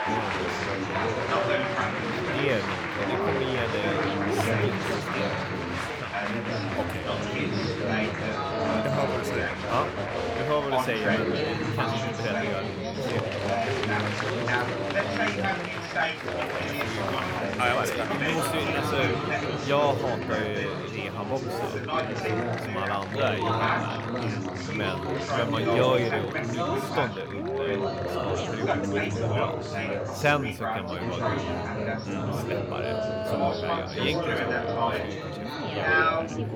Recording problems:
chatter from many people; very loud; throughout; 4 dB above the speech

